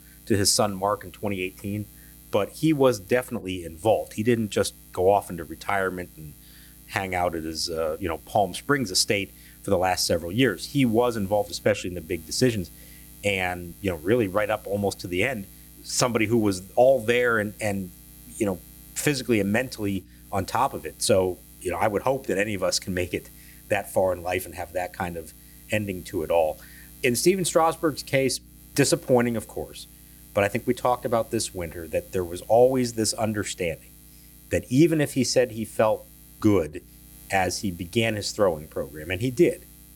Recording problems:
electrical hum; faint; throughout; 60 Hz, 25 dB below the speech

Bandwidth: 18.5 kHz